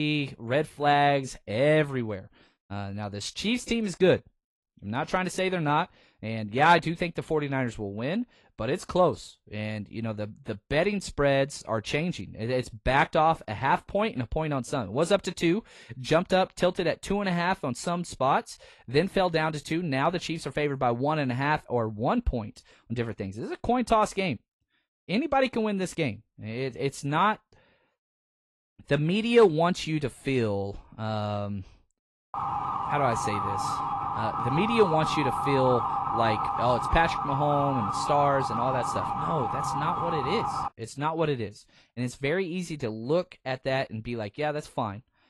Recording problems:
garbled, watery; slightly; nothing above 11.5 kHz
abrupt cut into speech; at the start
siren; noticeable; from 32 to 41 s; peak 1 dB below the speech

